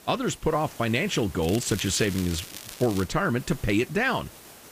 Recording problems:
hiss; noticeable; throughout; 20 dB below the speech
crackling; noticeable; from 1.5 to 3 s; 15 dB below the speech

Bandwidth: 15 kHz